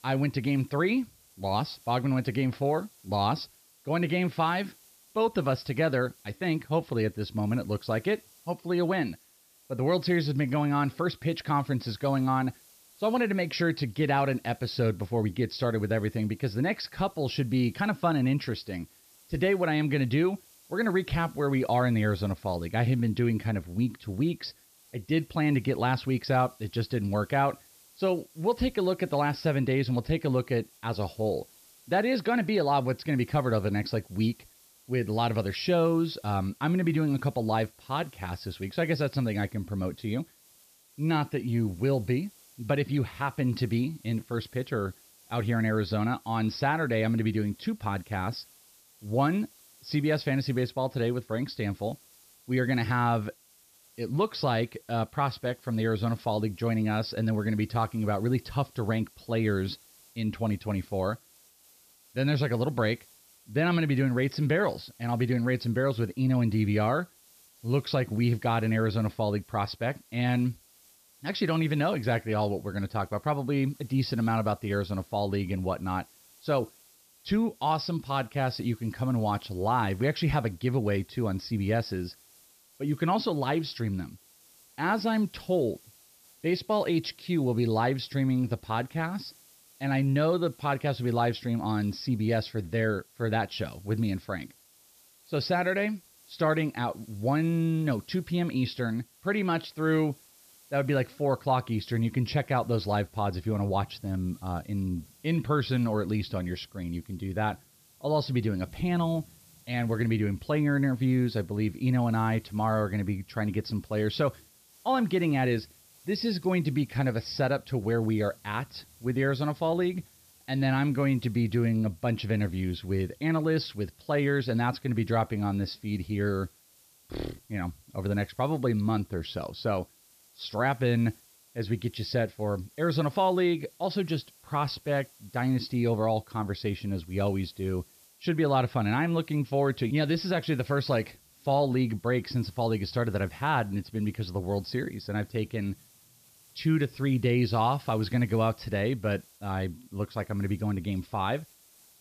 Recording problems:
high frequencies cut off; noticeable; nothing above 5.5 kHz
hiss; faint; throughout; 25 dB below the speech

